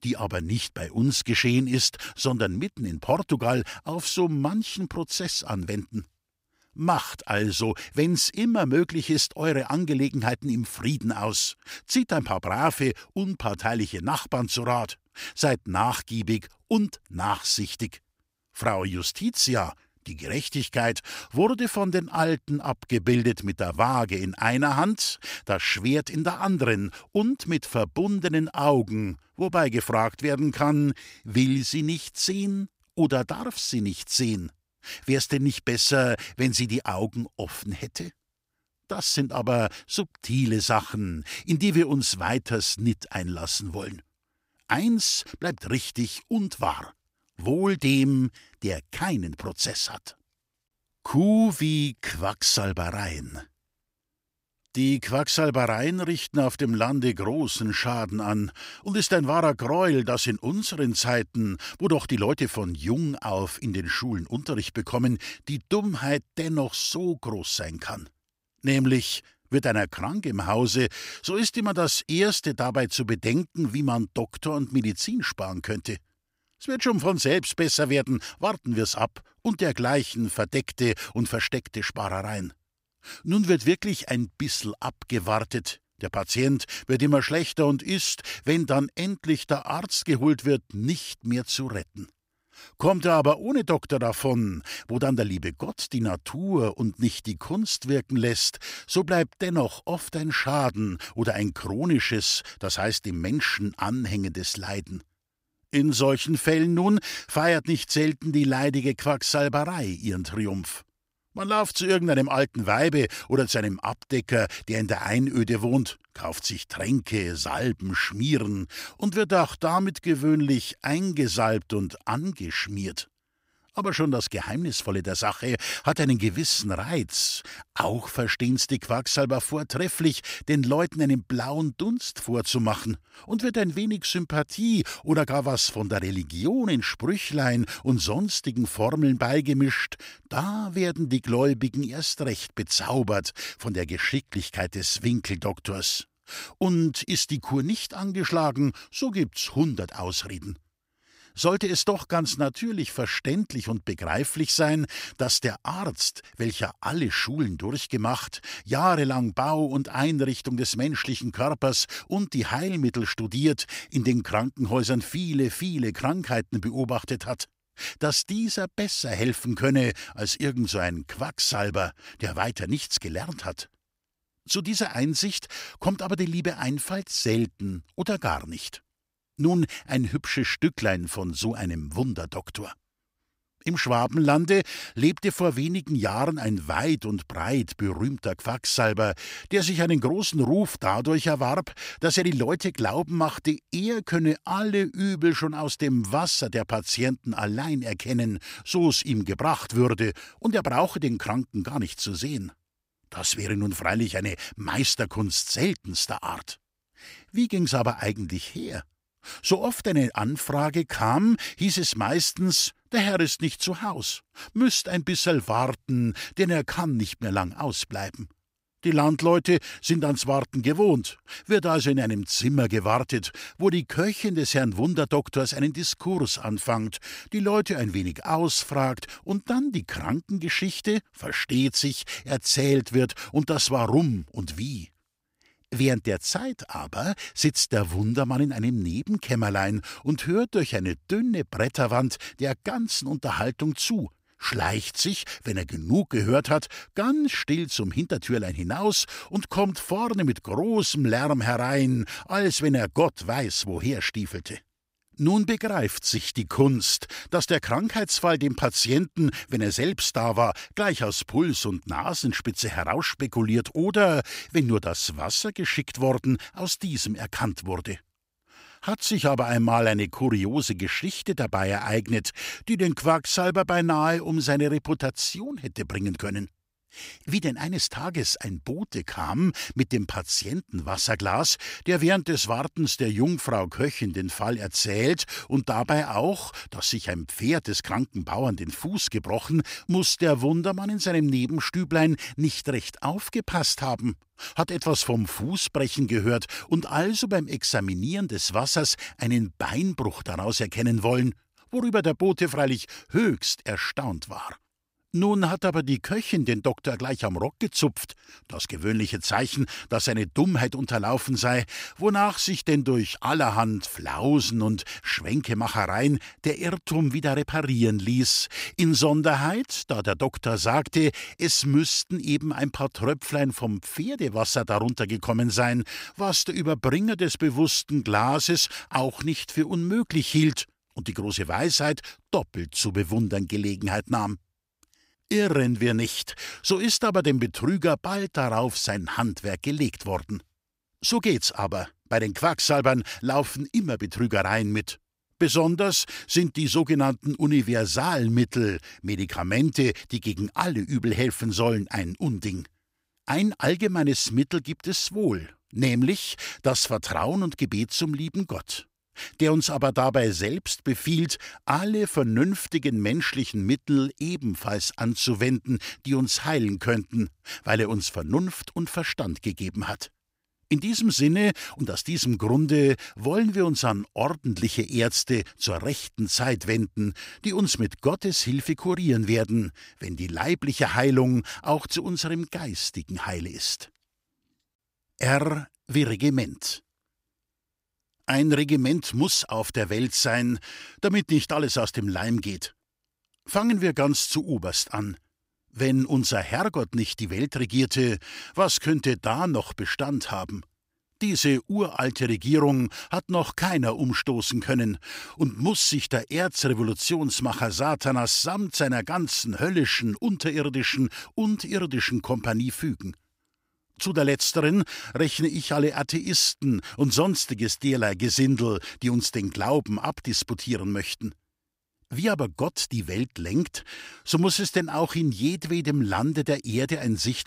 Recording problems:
none

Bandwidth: 15.5 kHz